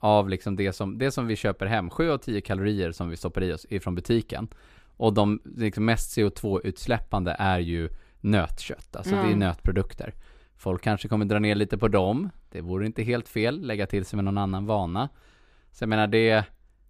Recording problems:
none

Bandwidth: 15 kHz